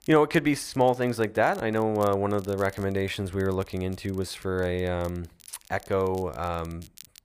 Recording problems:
crackle, like an old record; faint; 25 dB below the speech

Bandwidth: 15 kHz